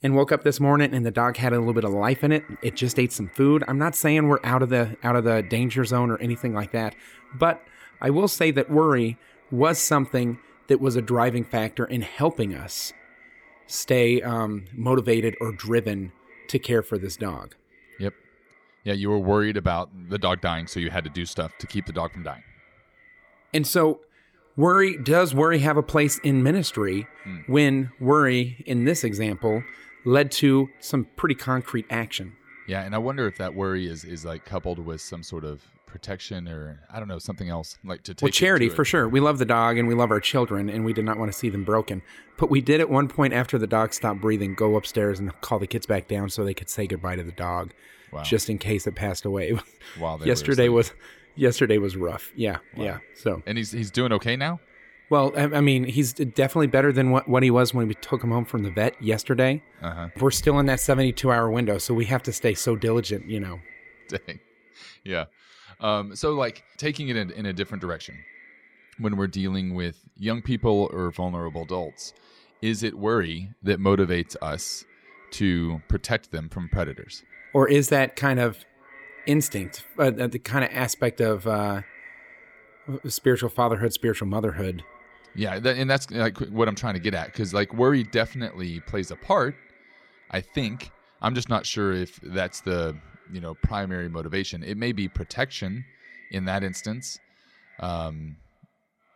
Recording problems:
echo of what is said; faint; throughout; 580 ms later, 25 dB below the speech

